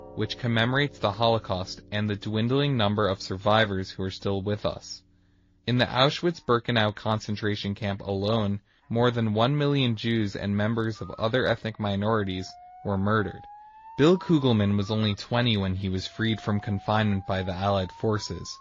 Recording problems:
garbled, watery; slightly
alarms or sirens; faint; throughout; 25 dB below the speech

